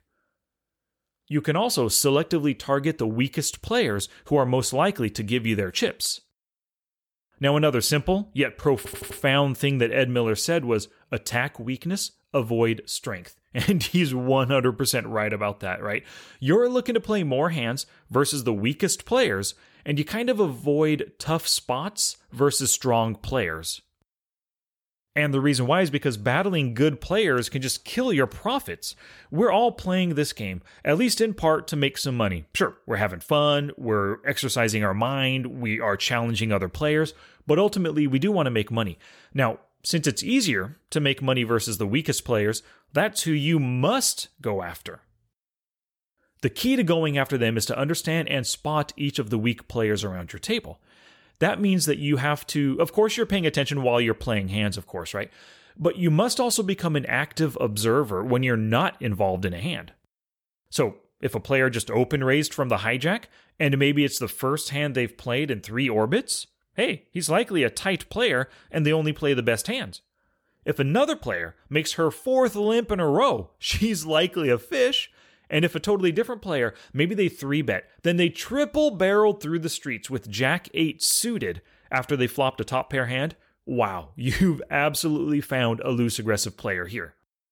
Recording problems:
audio stuttering; at 9 s

